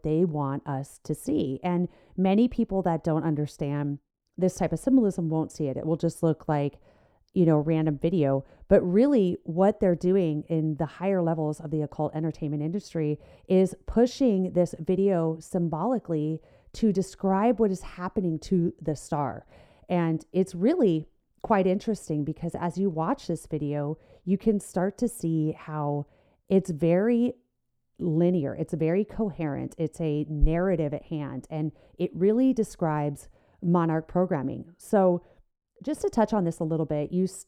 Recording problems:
muffled; slightly; fading above 1 kHz

